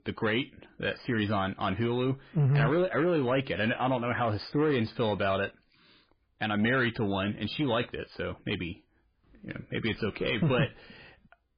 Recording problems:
garbled, watery; badly; nothing above 5 kHz
distortion; slight; 10 dB below the speech

